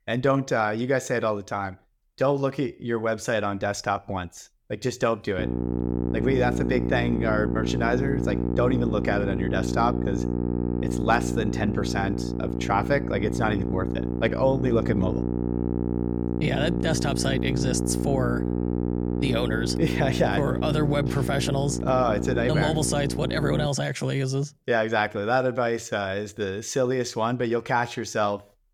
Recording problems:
electrical hum; loud; from 5.5 to 24 s; 60 Hz, 6 dB below the speech

